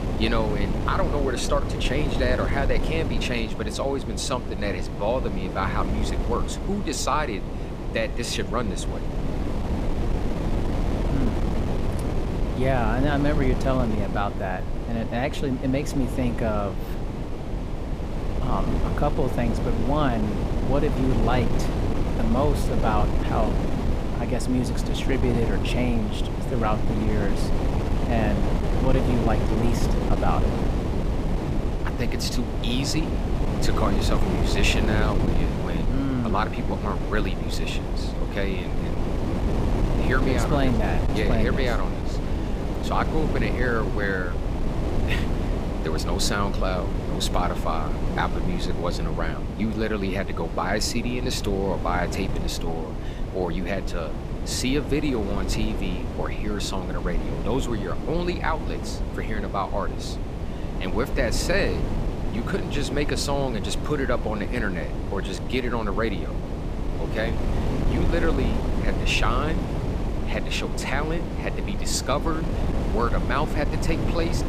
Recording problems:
wind noise on the microphone; heavy; 5 dB below the speech

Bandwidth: 14.5 kHz